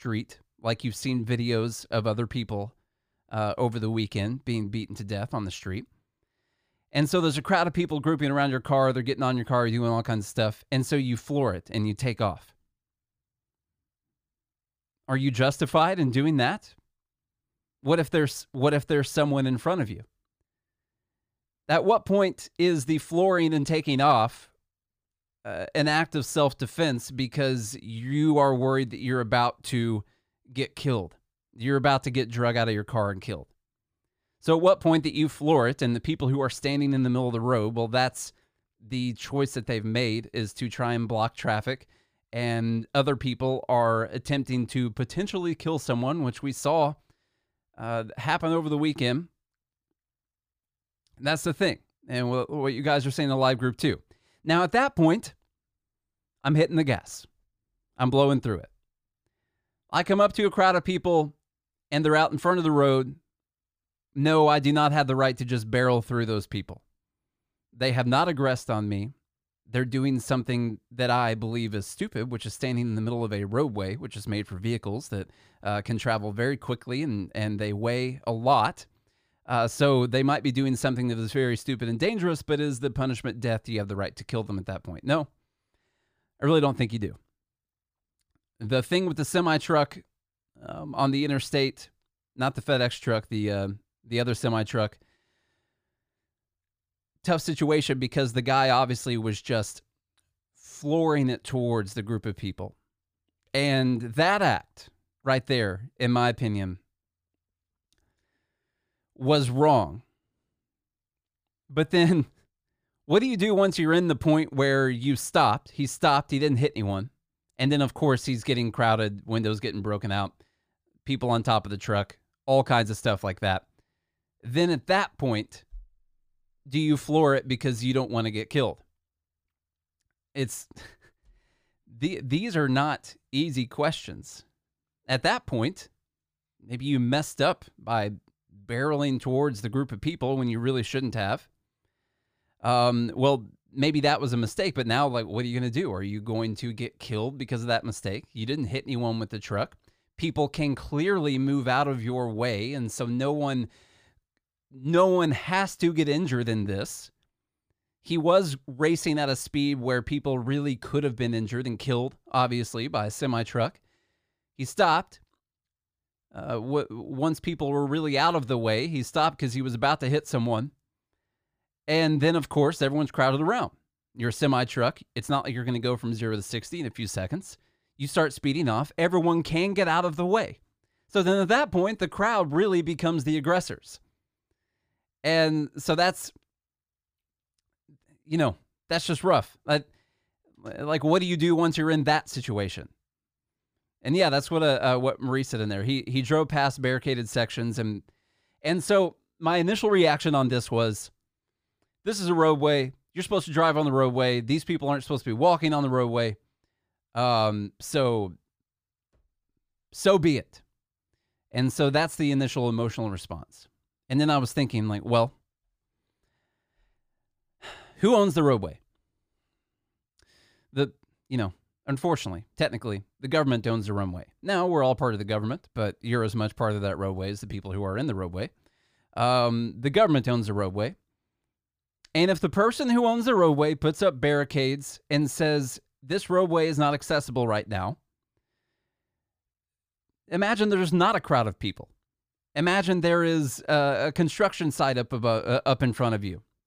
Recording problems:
none

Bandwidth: 15 kHz